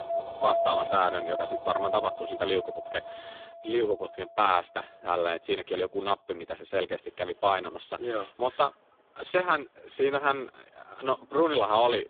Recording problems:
phone-call audio; poor line
household noises; noticeable; throughout; 20 dB below the speech

